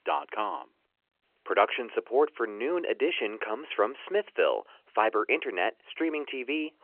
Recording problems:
phone-call audio; nothing above 3 kHz

